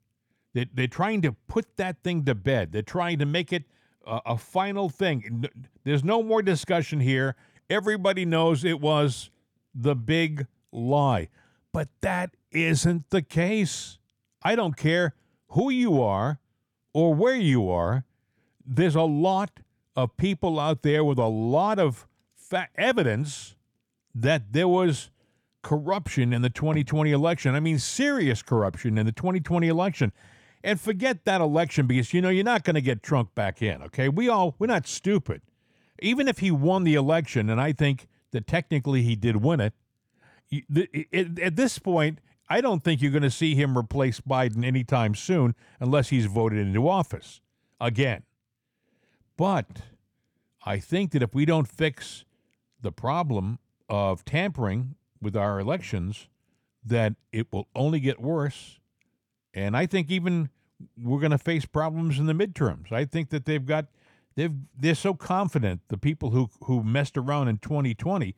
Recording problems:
none

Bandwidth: 19 kHz